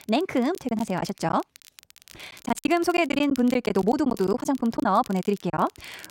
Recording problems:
wrong speed, natural pitch; too fast; 1.5 times normal speed
crackle, like an old record; faint; 25 dB below the speech
choppy; very; 11% of the speech affected

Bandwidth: 16 kHz